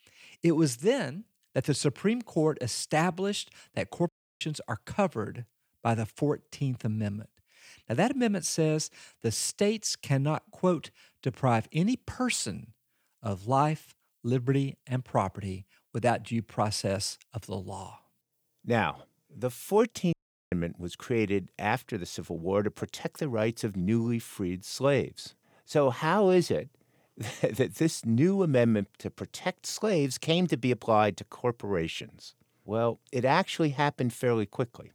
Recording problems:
audio cutting out; at 4 s and at 20 s

